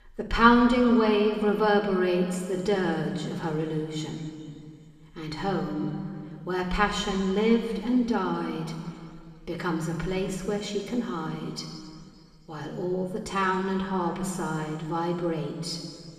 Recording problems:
room echo; noticeable; dies away in 2.4 s
off-mic speech; somewhat distant

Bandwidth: 14.5 kHz